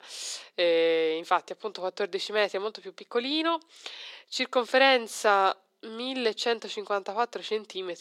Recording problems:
thin; very; fading below 400 Hz

